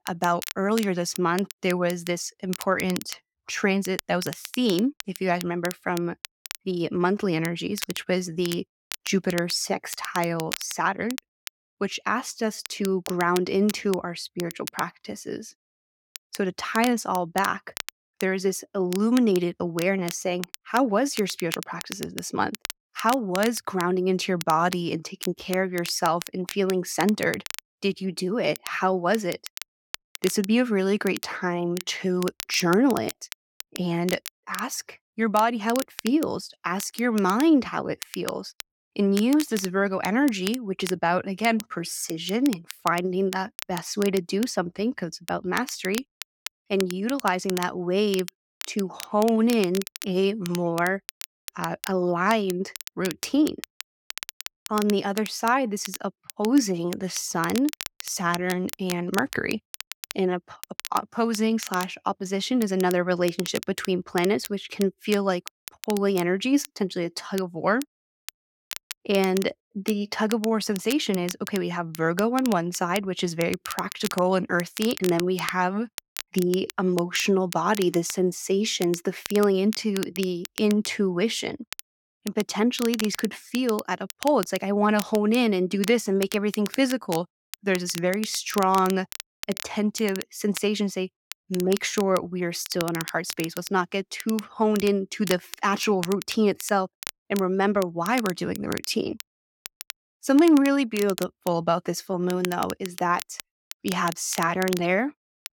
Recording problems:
crackle, like an old record; noticeable; 15 dB below the speech

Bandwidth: 17 kHz